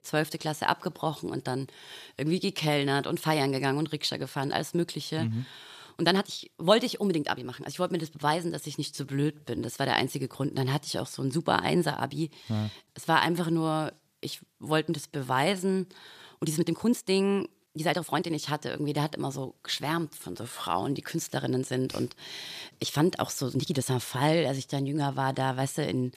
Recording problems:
uneven, jittery; strongly; from 1 to 24 s

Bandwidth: 14.5 kHz